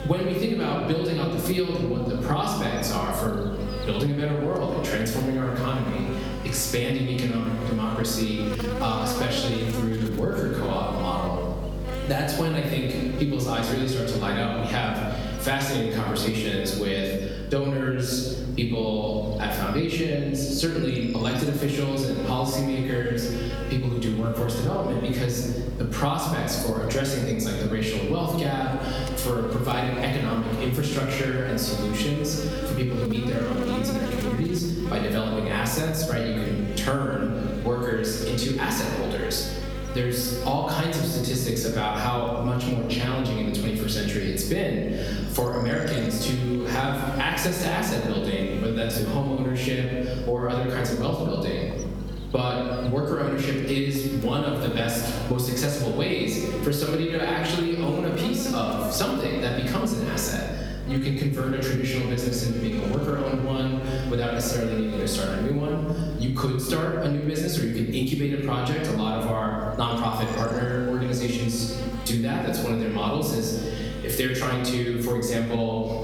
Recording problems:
off-mic speech; far
room echo; noticeable; dies away in 1.1 s
squashed, flat; somewhat
electrical hum; noticeable; throughout; 50 Hz, 10 dB below the speech

